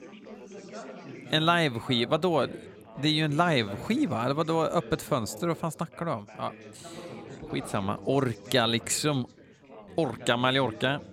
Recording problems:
background chatter; noticeable; throughout; 4 voices, 15 dB below the speech

